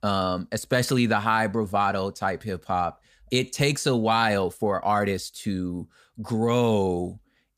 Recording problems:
none

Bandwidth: 15 kHz